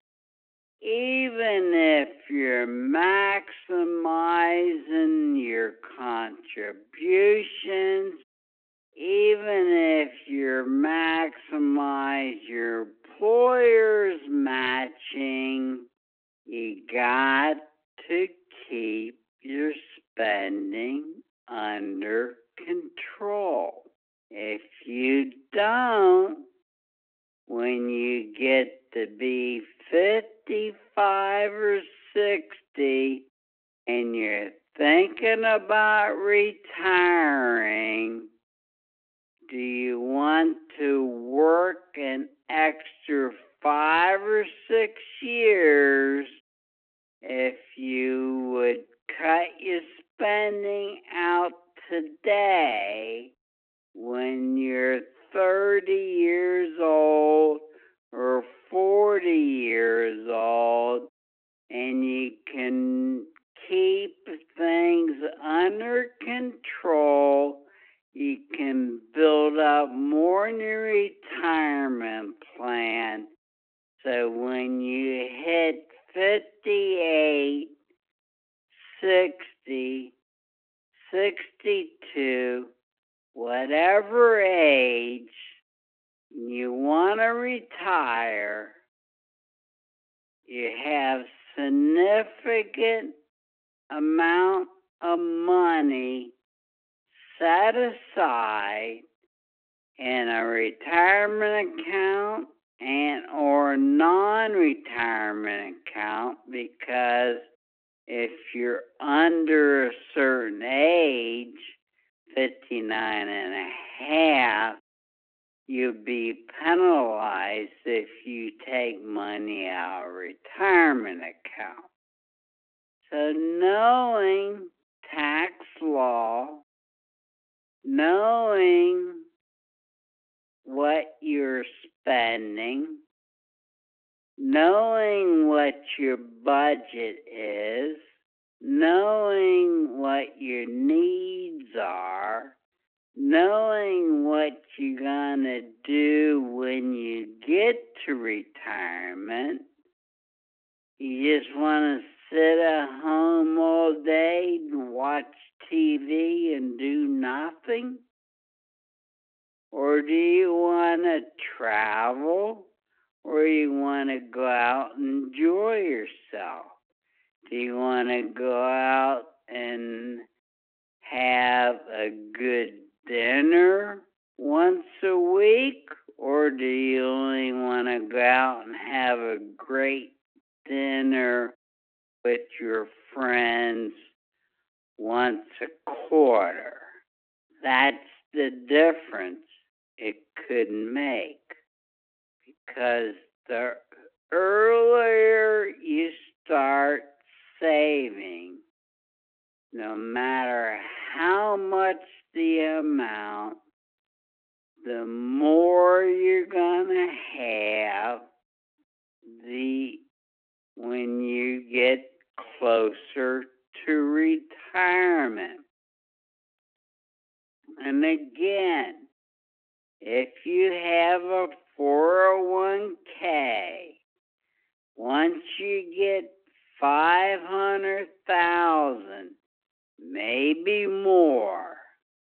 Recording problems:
wrong speed, natural pitch; too slow; 0.5 times normal speed
phone-call audio
thin; very slightly; fading below 250 Hz

